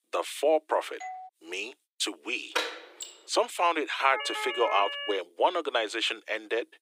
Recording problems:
thin; very; fading below 300 Hz
doorbell; faint; at 1 s; peak 15 dB below the speech
door banging; noticeable; at 2.5 s; peak 2 dB below the speech
siren; noticeable; from 4 to 5 s; peak 4 dB below the speech

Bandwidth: 15.5 kHz